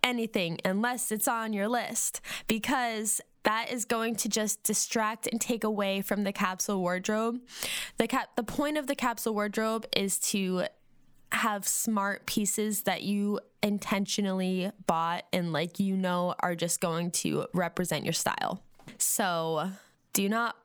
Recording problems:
squashed, flat; somewhat

